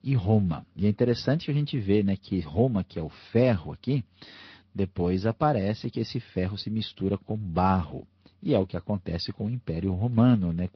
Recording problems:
high frequencies cut off; noticeable; nothing above 5.5 kHz
garbled, watery; slightly

